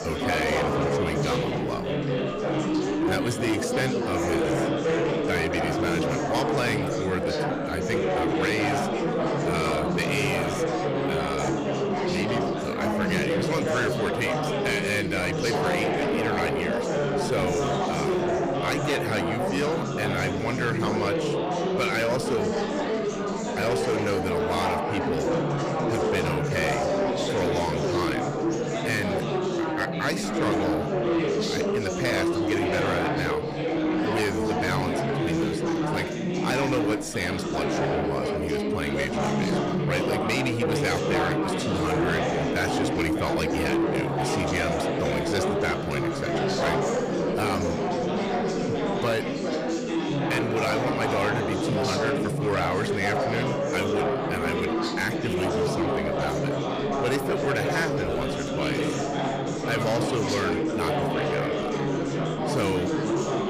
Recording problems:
distortion; slight; 10 dB below the speech
chatter from many people; very loud; throughout; 2 dB above the speech

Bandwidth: 15 kHz